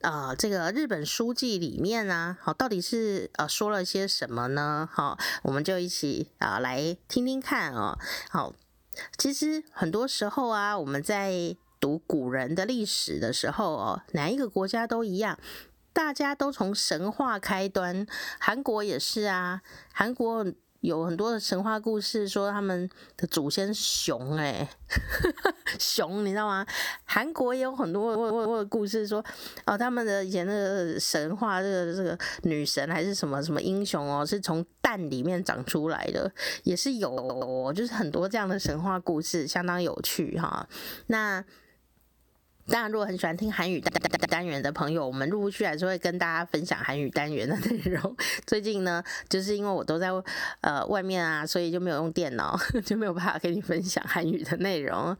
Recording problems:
squashed, flat; somewhat
audio stuttering; at 28 s, at 37 s and at 44 s

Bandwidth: 18.5 kHz